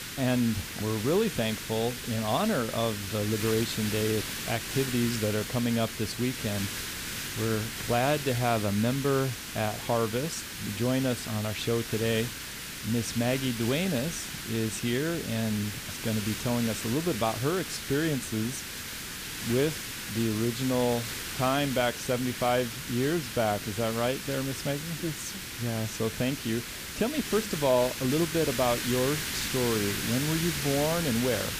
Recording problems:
hiss; loud; throughout; 5 dB below the speech

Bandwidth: 15 kHz